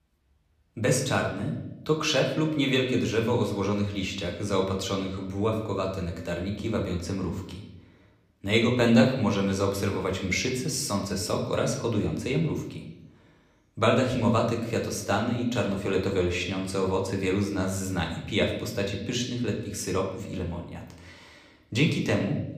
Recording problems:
room echo; slight; dies away in 0.8 s
off-mic speech; somewhat distant

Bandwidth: 15 kHz